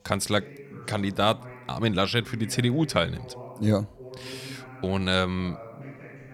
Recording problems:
voice in the background; noticeable; throughout; 20 dB below the speech

